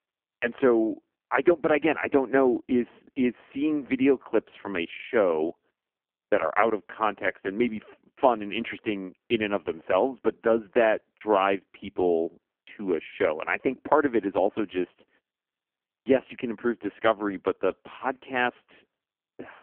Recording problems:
phone-call audio; poor line; nothing above 3 kHz

